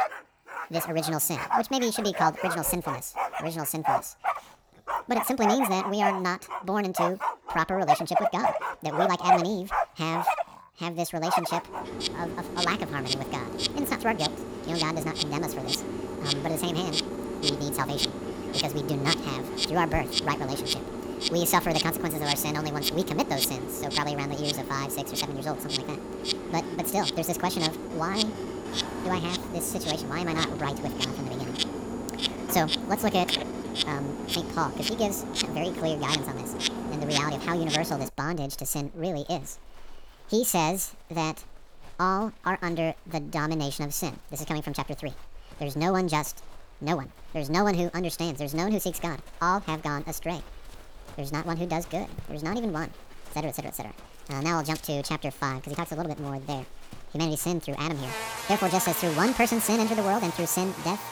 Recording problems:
wrong speed and pitch; too fast and too high; 1.6 times normal speed
animal sounds; loud; throughout; 1 dB below the speech

